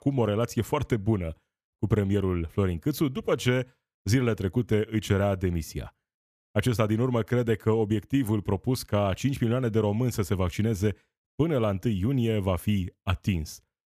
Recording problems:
none

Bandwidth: 14.5 kHz